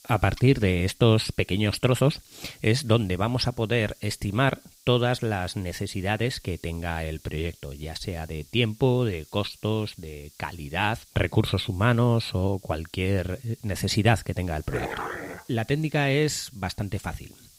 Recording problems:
hiss; faint; throughout; 25 dB below the speech
dog barking; noticeable; at 15 s; peak 6 dB below the speech

